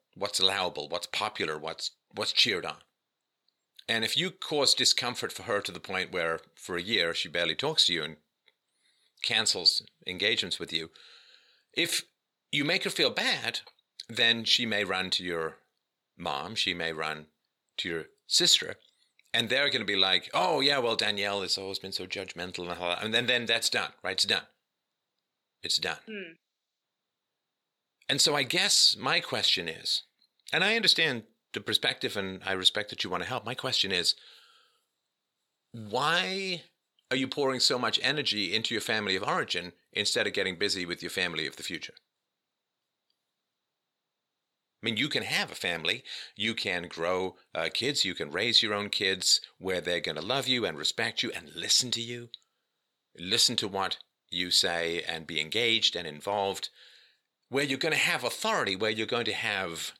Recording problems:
thin; very slightly; fading below 500 Hz

